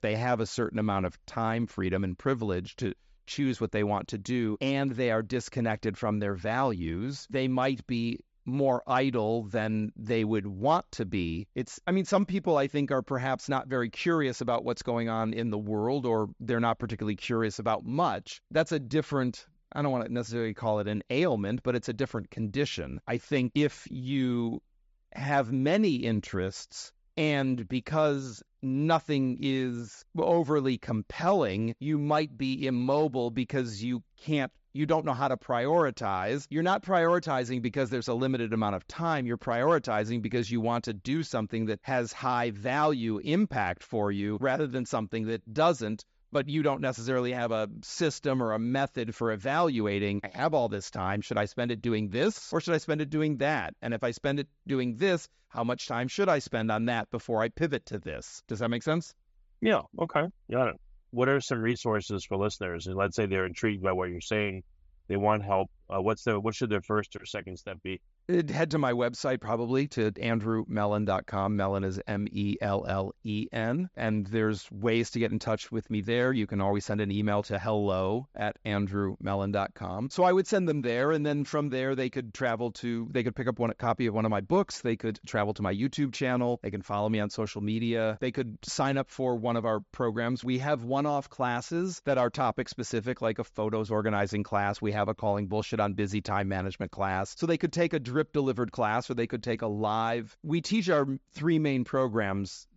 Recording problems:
high frequencies cut off; noticeable; nothing above 8 kHz

